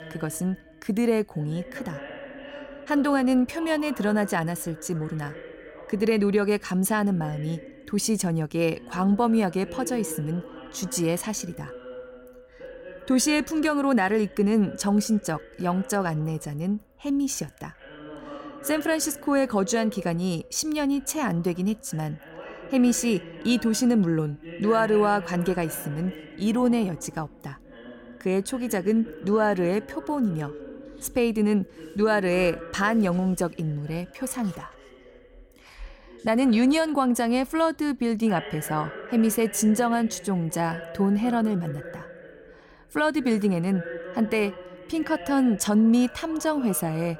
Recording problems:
voice in the background; noticeable; throughout; 15 dB below the speech

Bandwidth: 16.5 kHz